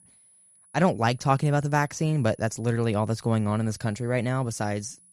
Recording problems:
high-pitched whine; faint; throughout; 10.5 kHz, 30 dB below the speech

